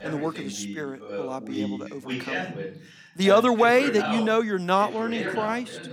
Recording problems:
voice in the background; loud; throughout; 10 dB below the speech

